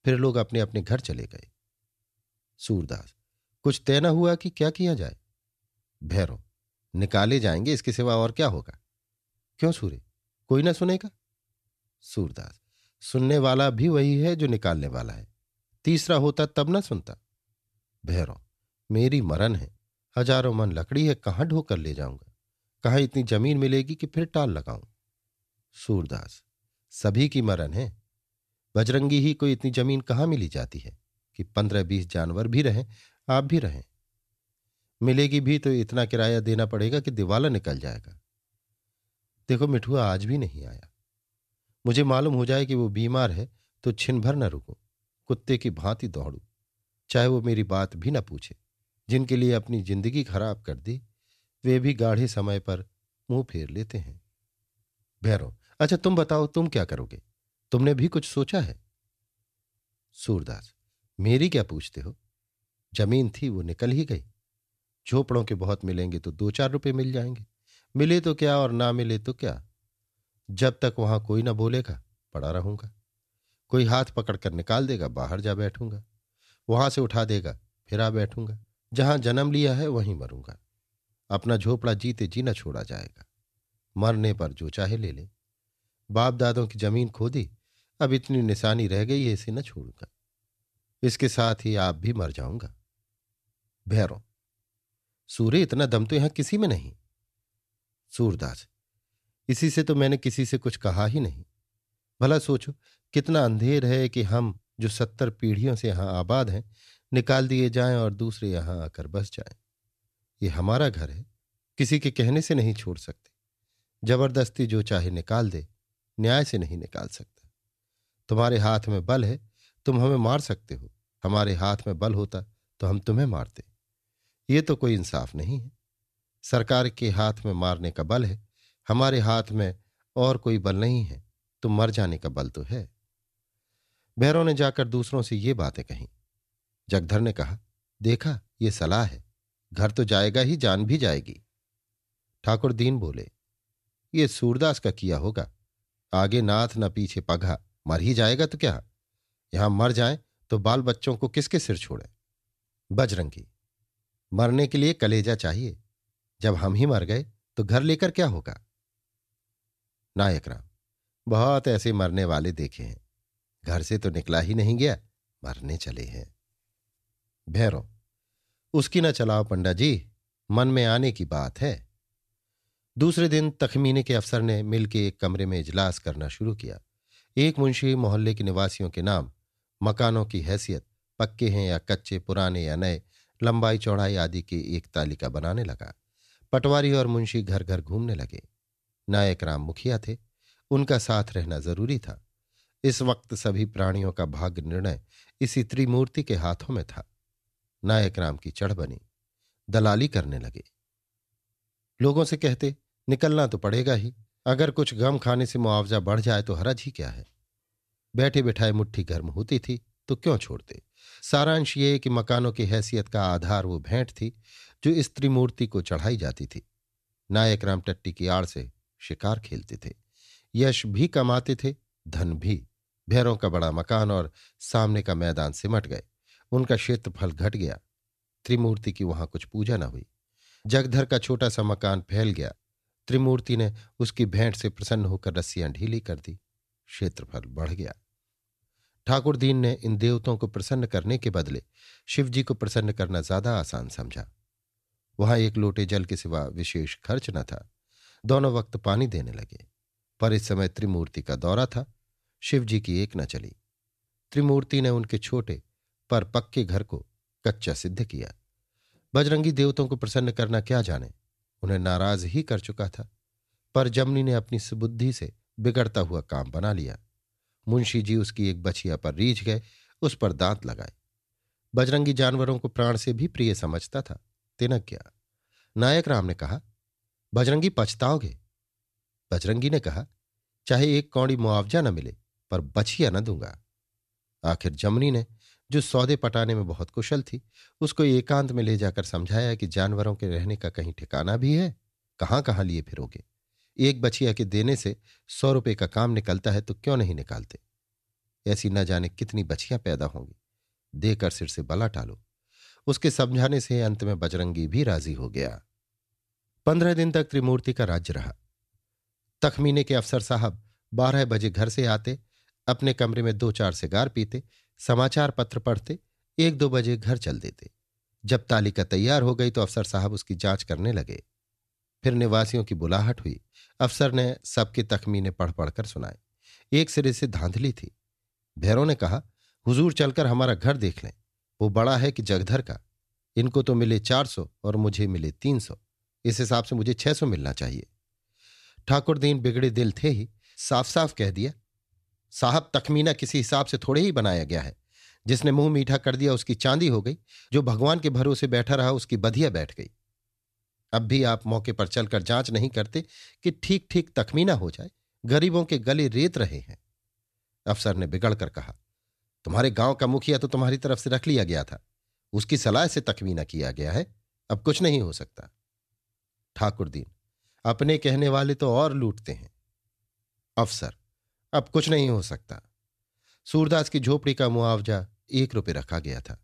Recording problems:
none

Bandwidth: 14 kHz